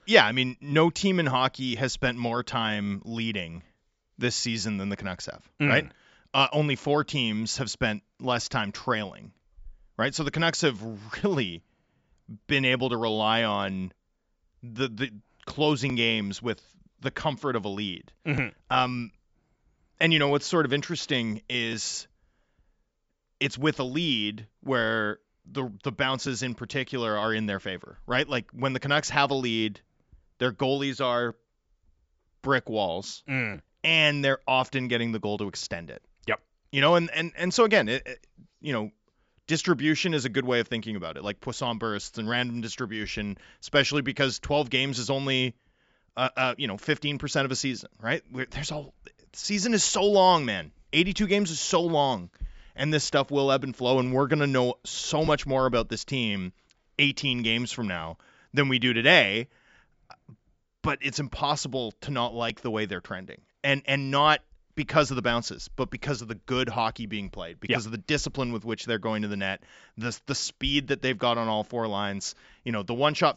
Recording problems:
high frequencies cut off; noticeable; nothing above 8 kHz

